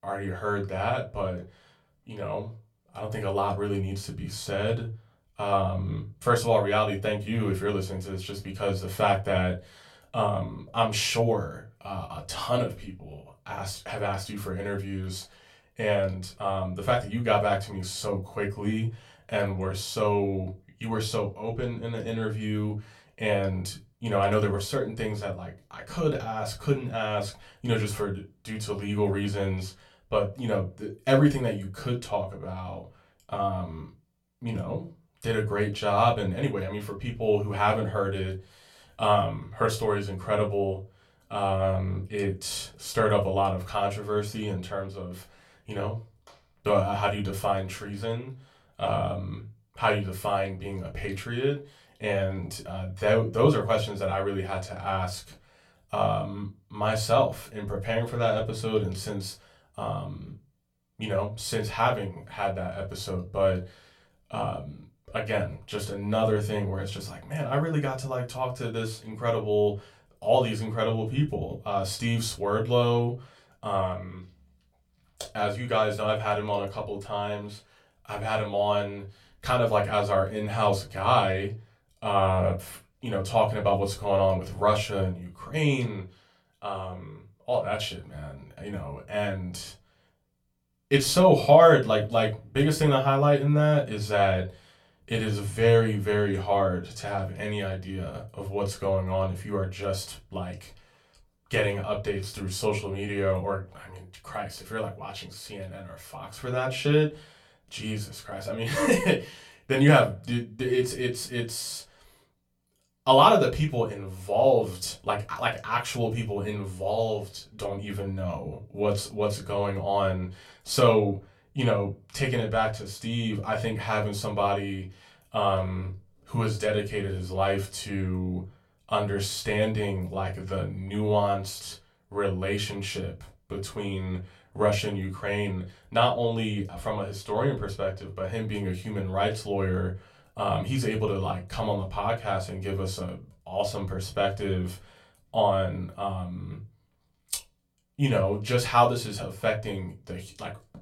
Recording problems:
off-mic speech; far
room echo; very slight; dies away in 0.2 s

